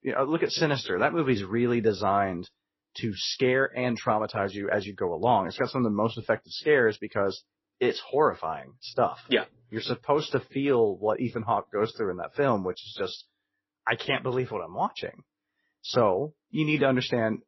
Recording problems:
garbled, watery; slightly; nothing above 5.5 kHz

